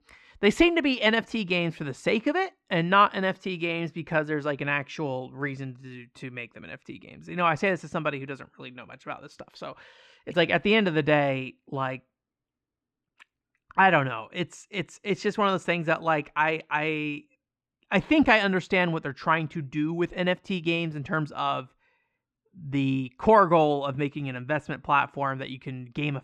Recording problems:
muffled; slightly; fading above 3 kHz

